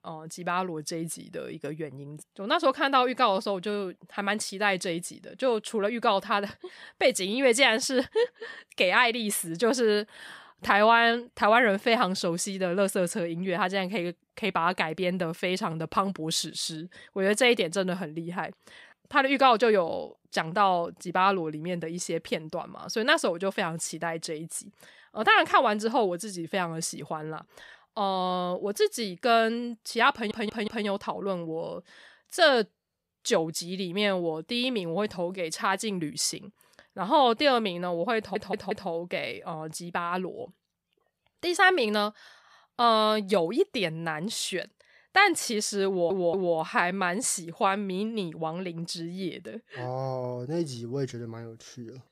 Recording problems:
audio stuttering; at 30 s, at 38 s and at 46 s

